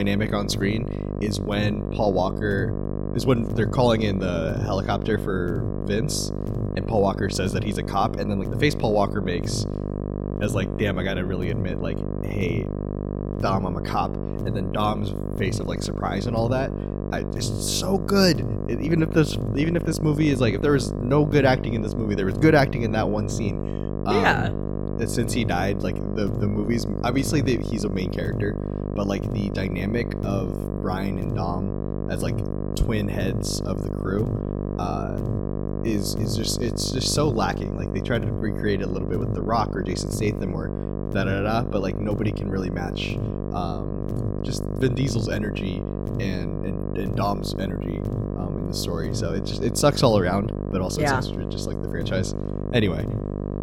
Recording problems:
electrical hum; loud; throughout; 50 Hz, 7 dB below the speech
abrupt cut into speech; at the start

